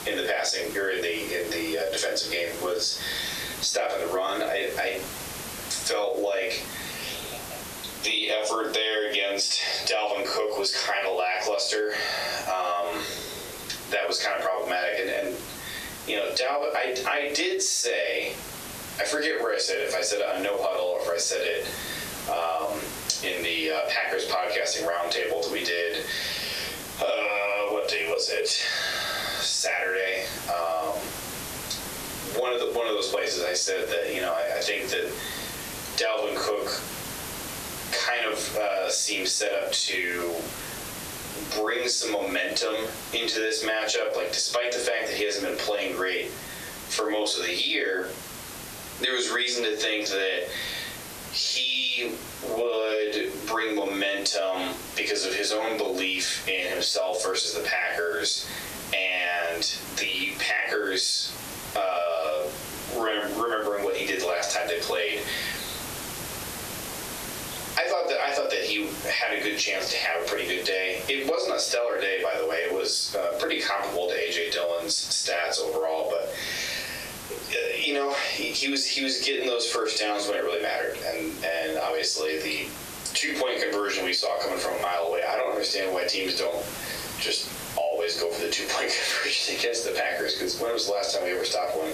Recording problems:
off-mic speech; far
thin; very; fading below 400 Hz
squashed, flat; heavily
room echo; slight; dies away in 0.3 s
hiss; noticeable; throughout; 15 dB below the speech

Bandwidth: 14 kHz